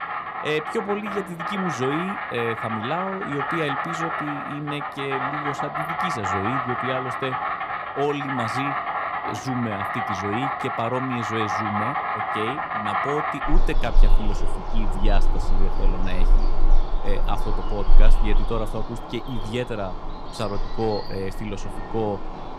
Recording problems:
animal sounds; very loud; throughout; 2 dB above the speech

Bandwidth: 15.5 kHz